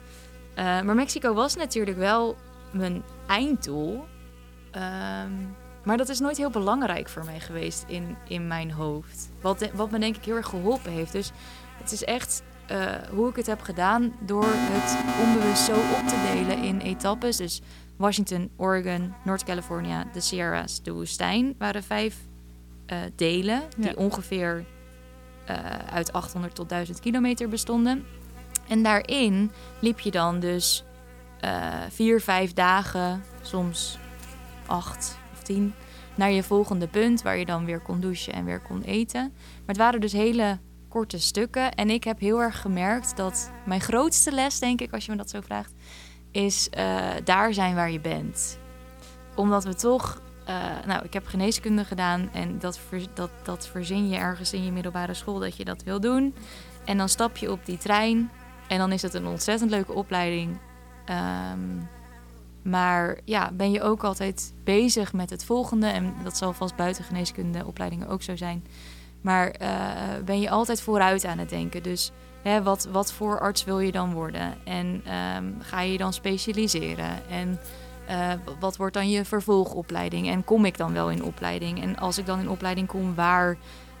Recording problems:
electrical hum; faint; throughout; 60 Hz, 20 dB below the speech
alarm; loud; from 14 to 17 s; peak 1 dB above the speech

